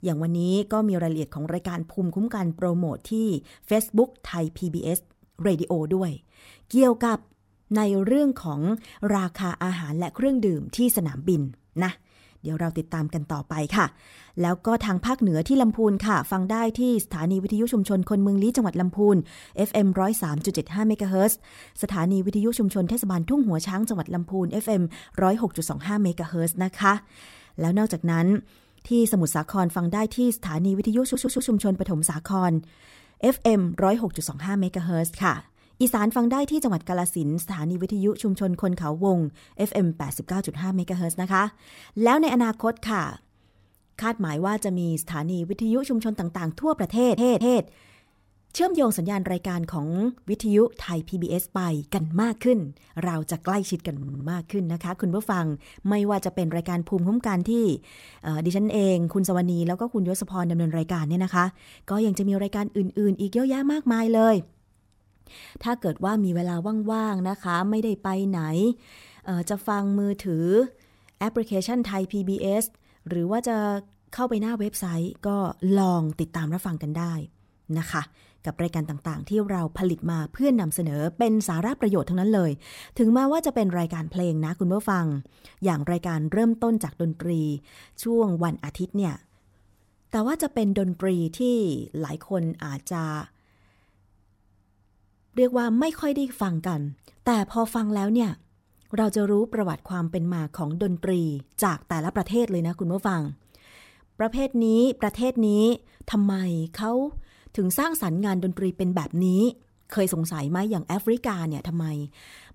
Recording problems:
audio stuttering; at 31 s, at 47 s and at 54 s

